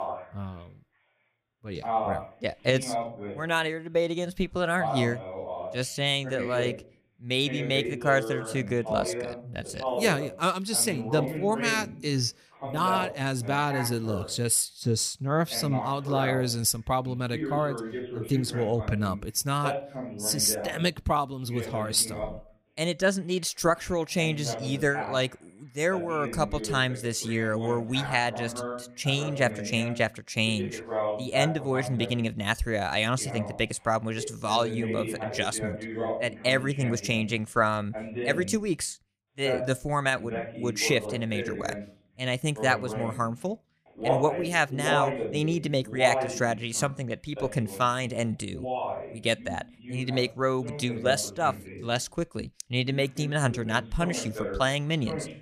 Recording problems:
voice in the background; loud; throughout; 7 dB below the speech

